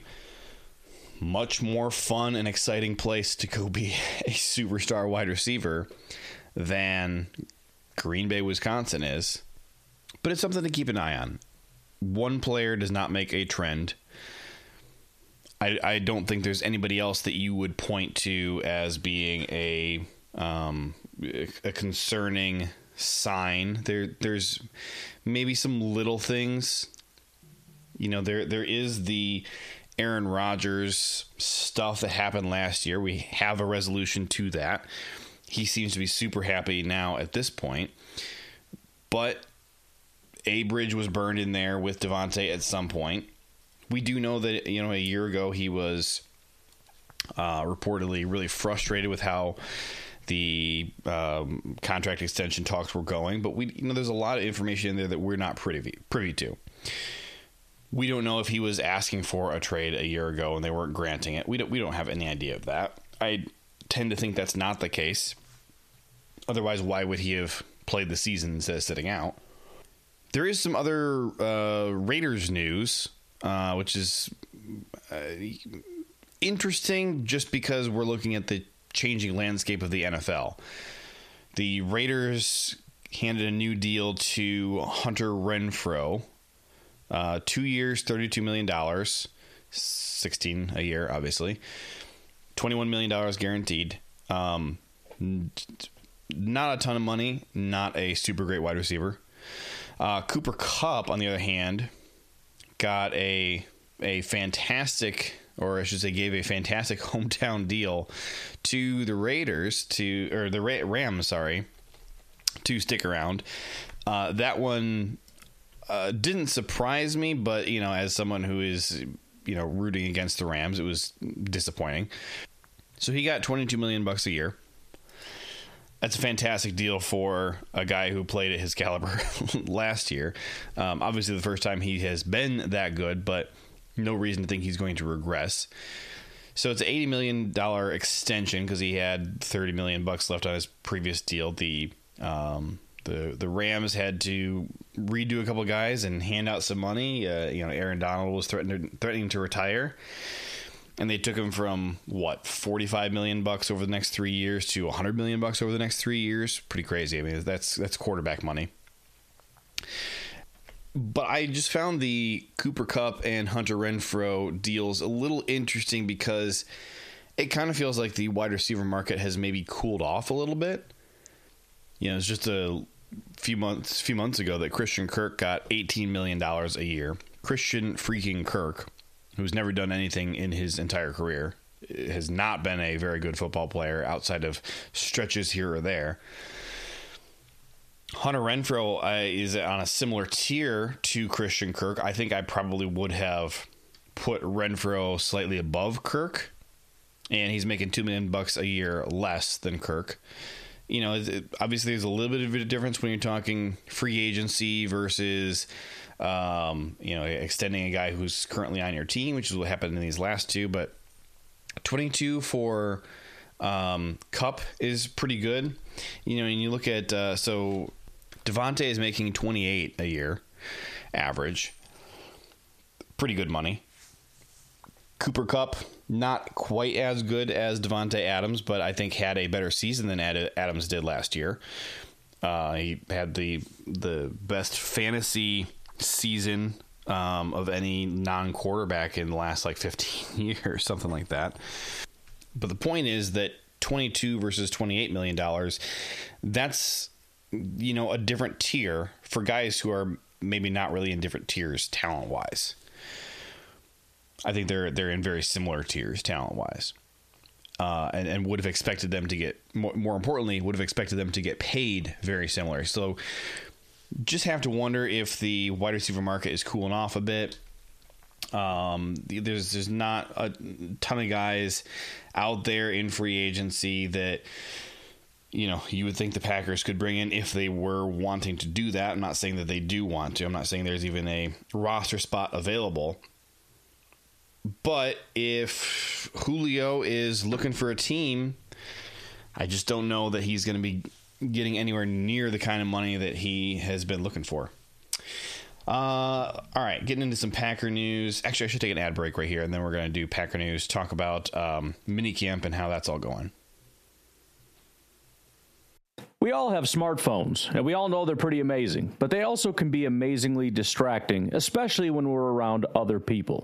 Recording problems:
squashed, flat; heavily

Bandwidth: 14.5 kHz